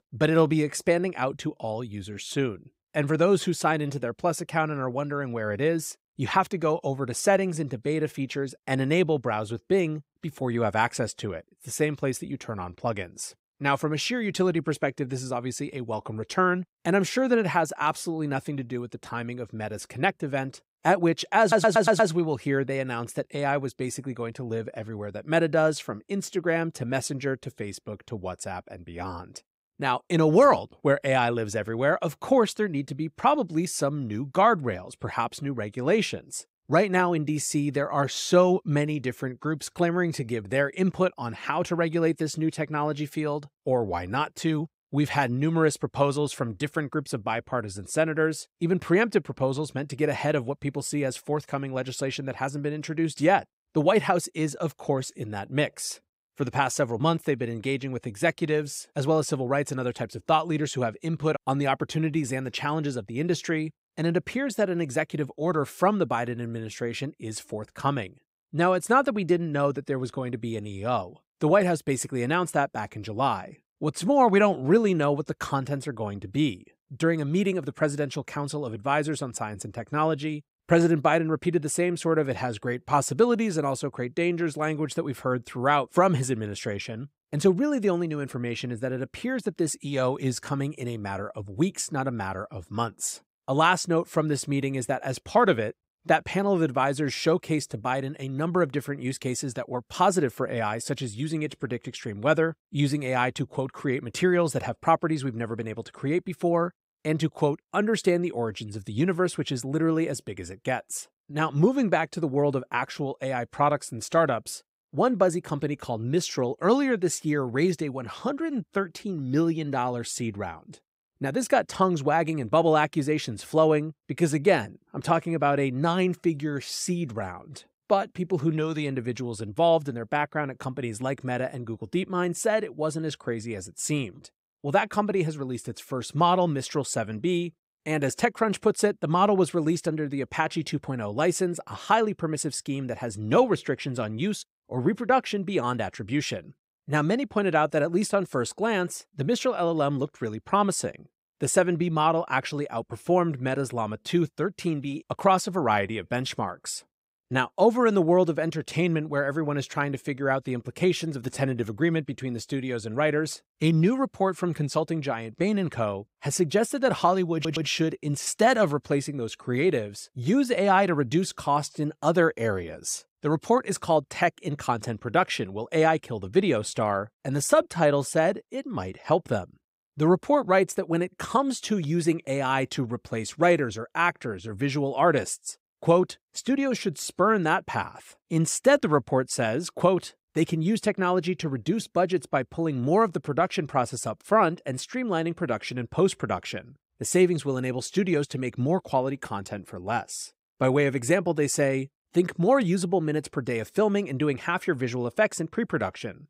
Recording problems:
audio stuttering; at 21 s and at 2:47

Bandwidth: 15.5 kHz